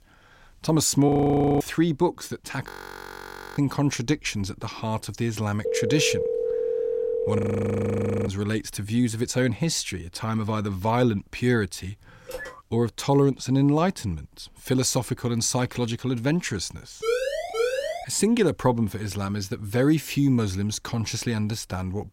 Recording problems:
audio freezing; at 1 s for 0.5 s, at 2.5 s for 1 s and at 7.5 s for 1 s
phone ringing; noticeable; from 5.5 to 7.5 s; peak 1 dB below the speech
phone ringing; faint; at 12 s; peak 10 dB below the speech
siren; noticeable; from 17 to 18 s; peak 1 dB below the speech

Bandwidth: 16 kHz